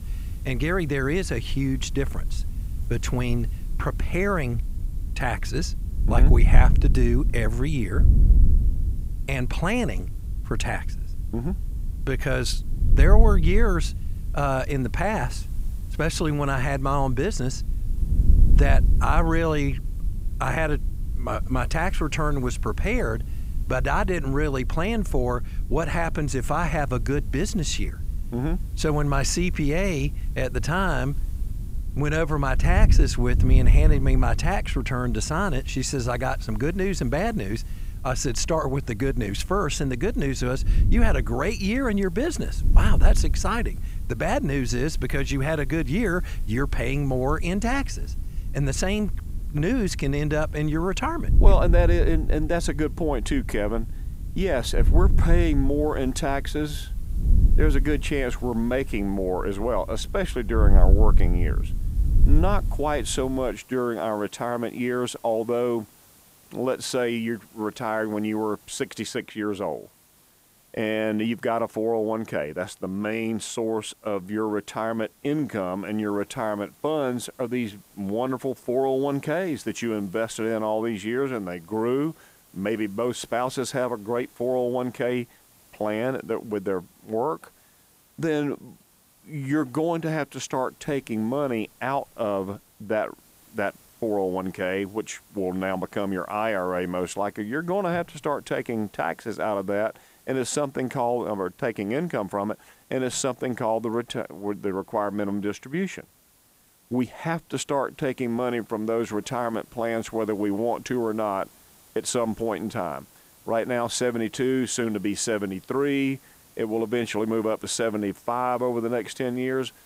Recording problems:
wind noise on the microphone; occasional gusts; until 1:03; 15 dB below the speech
hiss; faint; throughout; 25 dB below the speech

